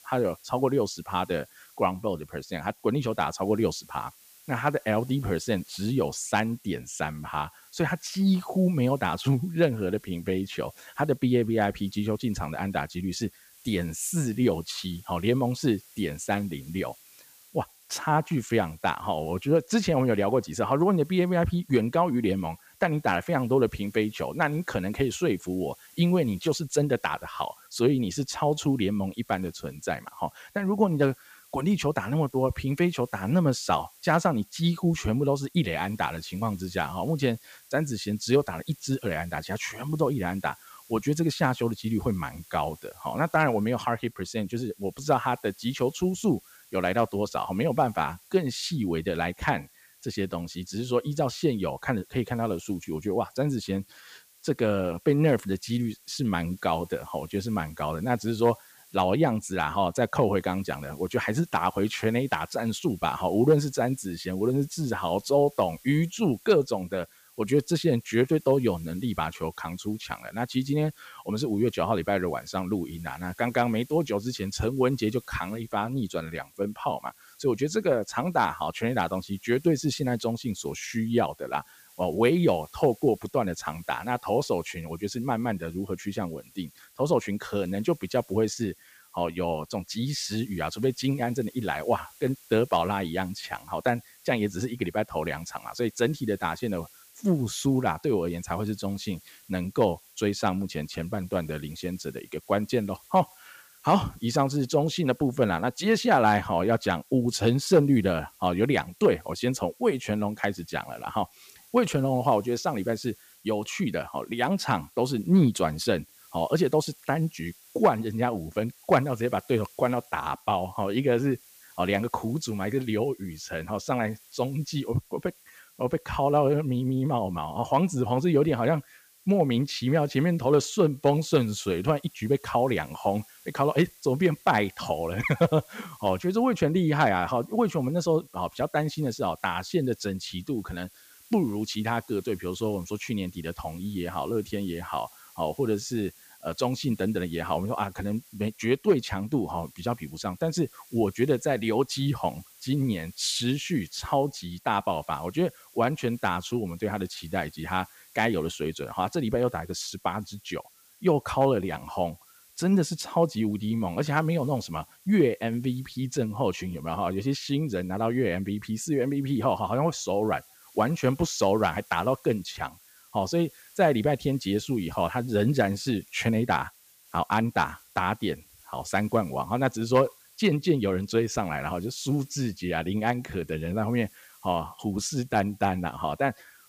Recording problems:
hiss; faint; throughout; 25 dB below the speech

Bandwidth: 15 kHz